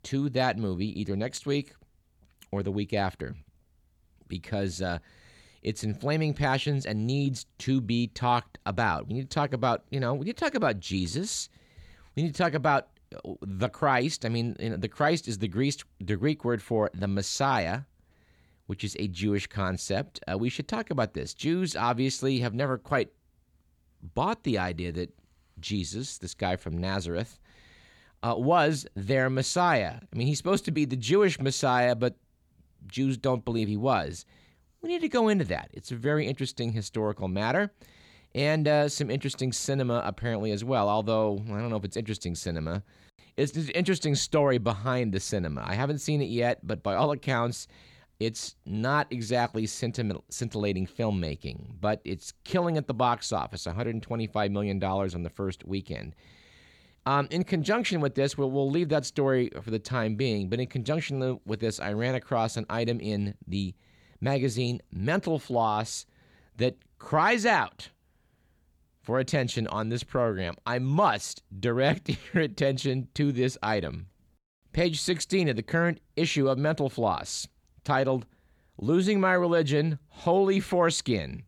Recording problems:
none

